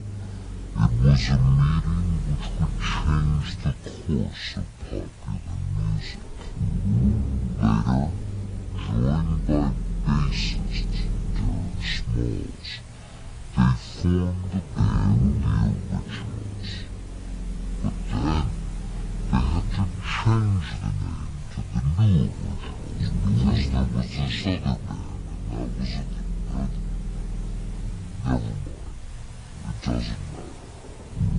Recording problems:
wrong speed and pitch; too slow and too low; 0.5 times normal speed
garbled, watery; slightly
low rumble; loud; throughout; 8 dB below the speech
hiss; faint; throughout; 20 dB below the speech

